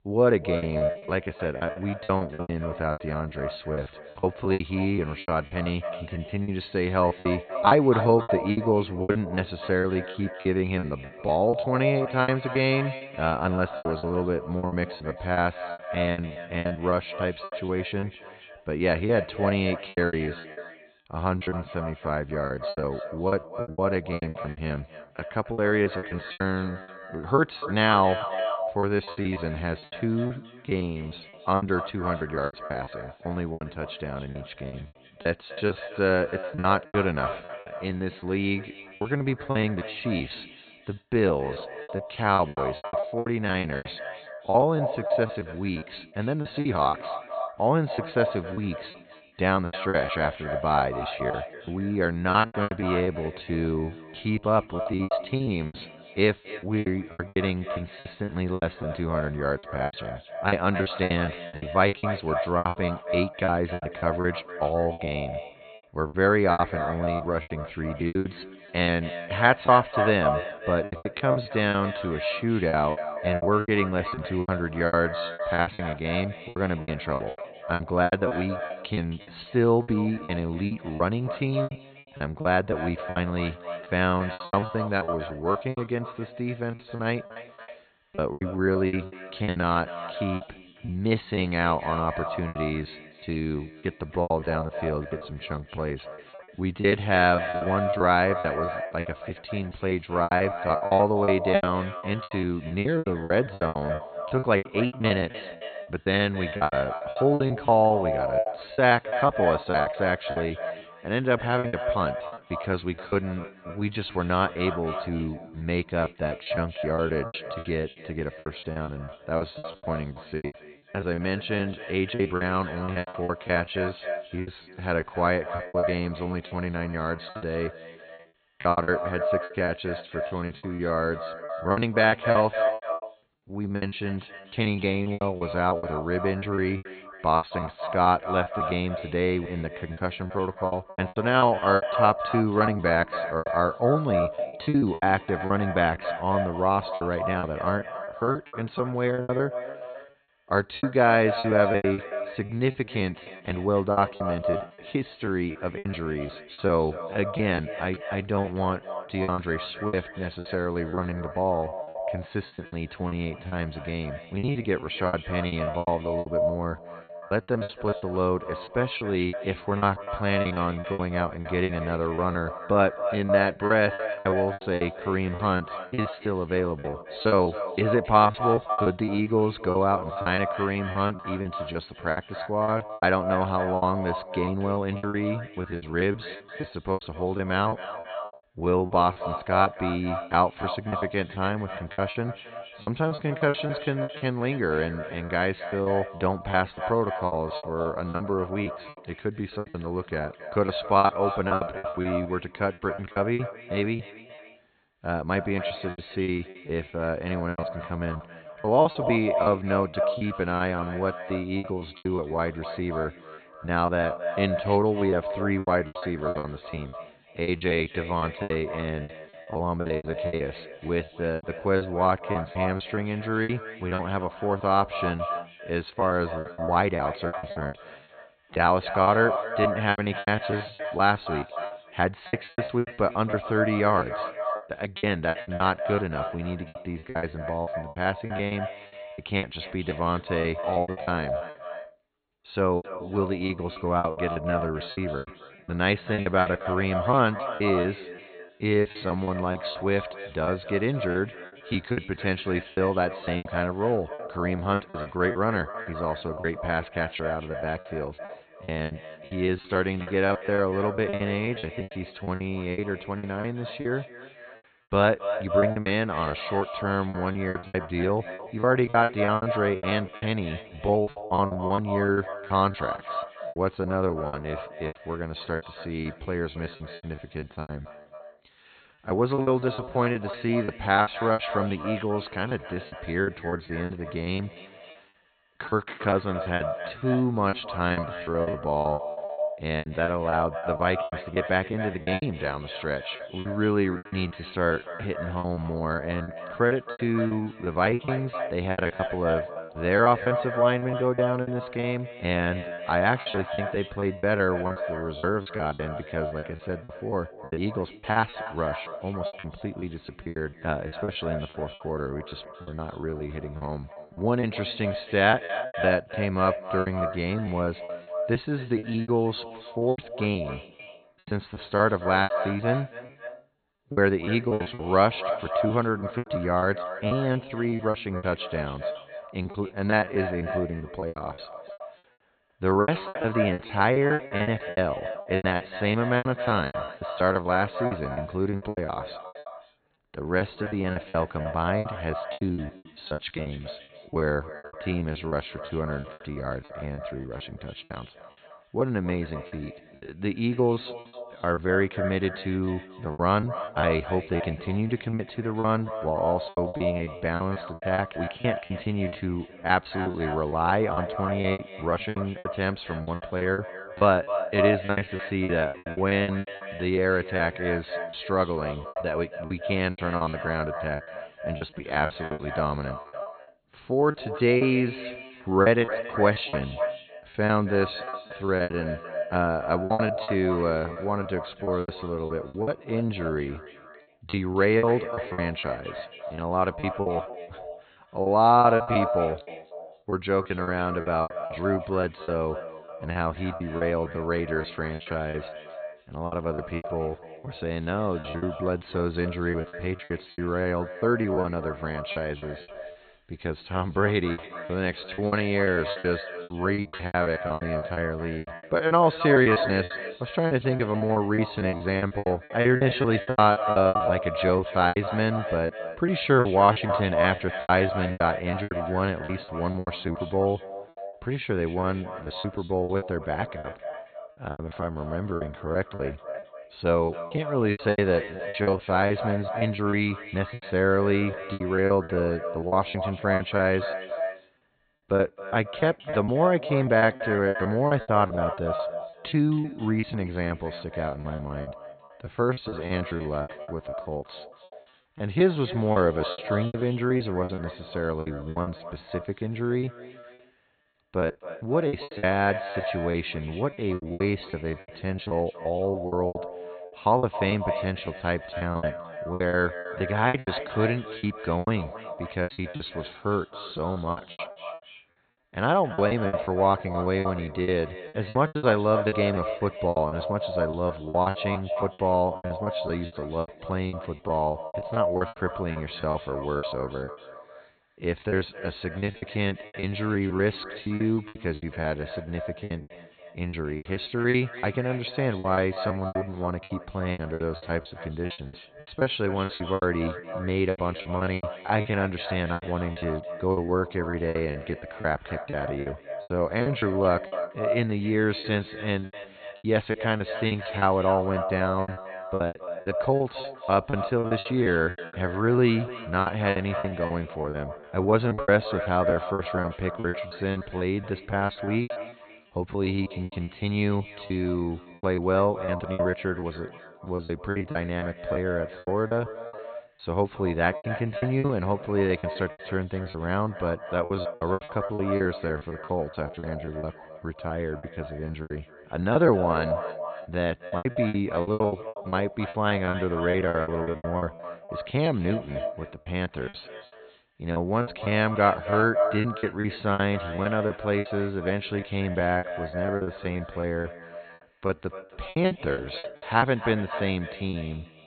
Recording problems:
echo of what is said; strong; throughout; 270 ms later, 8 dB below the speech
high frequencies cut off; severe; nothing above 4.5 kHz
choppy; very; 16% of the speech affected

